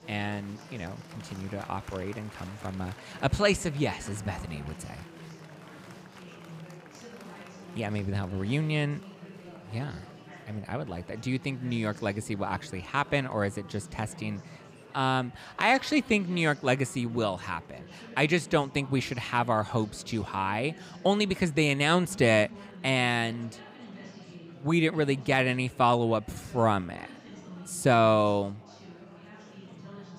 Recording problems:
murmuring crowd; noticeable; throughout; 20 dB below the speech

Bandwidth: 15.5 kHz